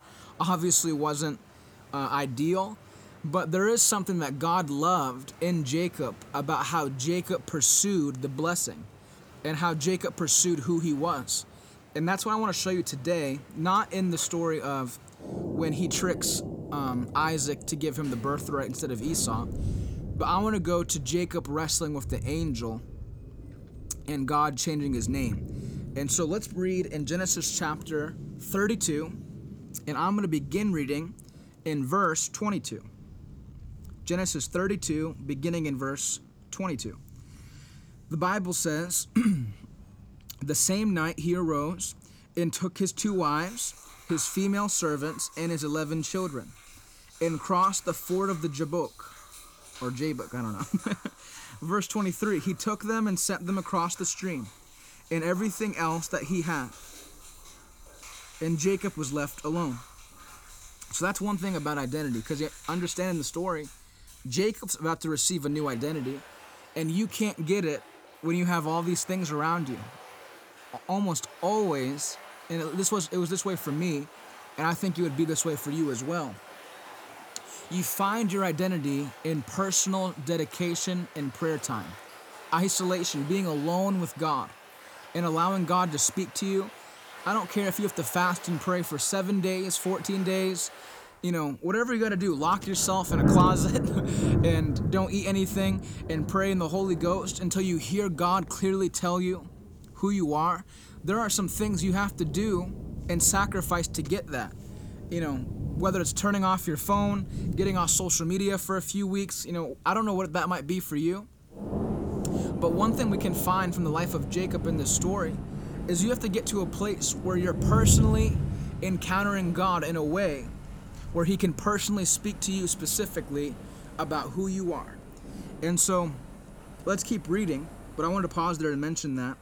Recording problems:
rain or running water; loud; throughout; 8 dB below the speech

